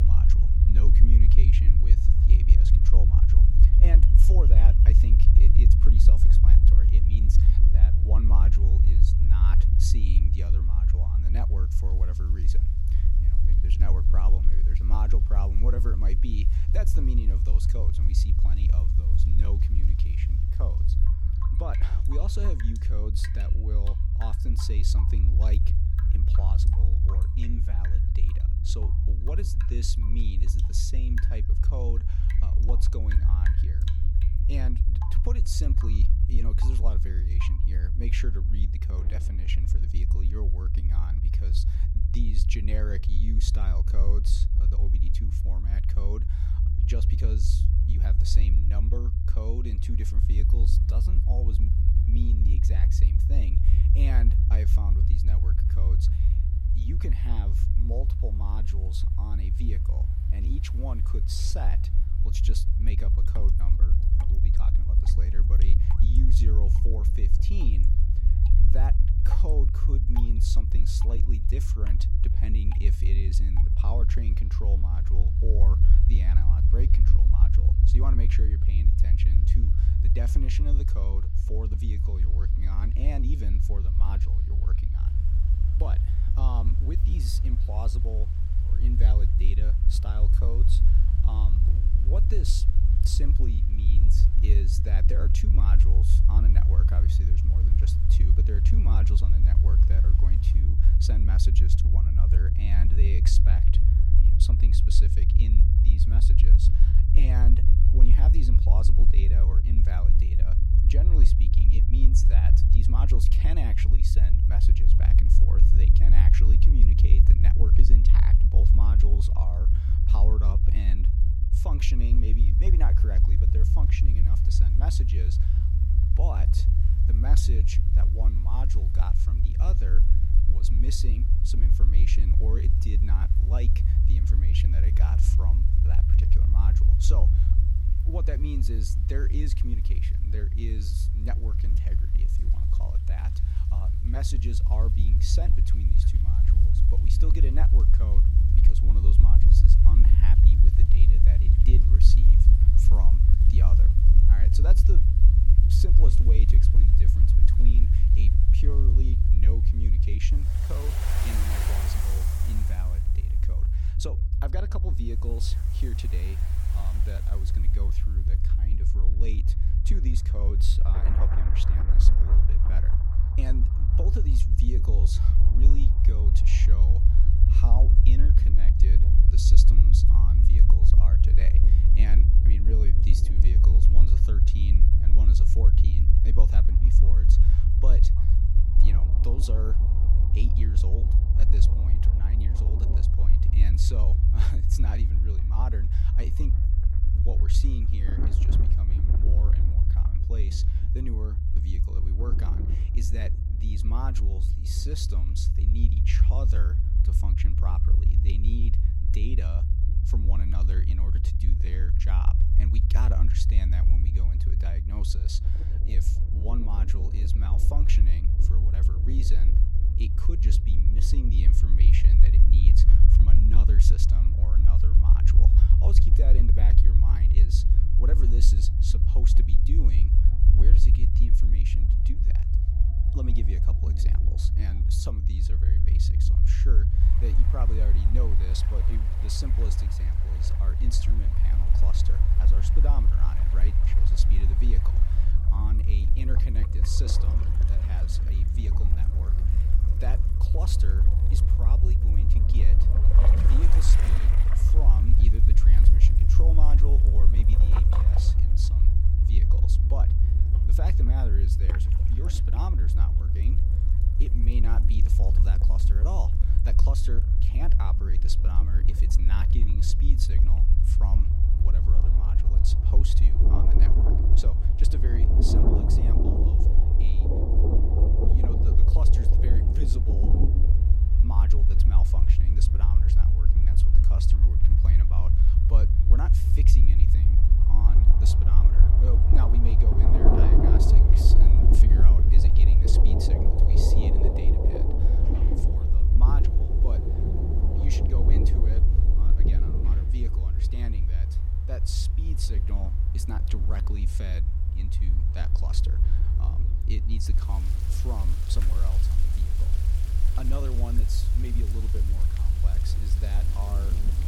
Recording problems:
rain or running water; very loud; throughout; 1 dB above the speech
low rumble; loud; throughout; as loud as the speech
abrupt cut into speech; at the start

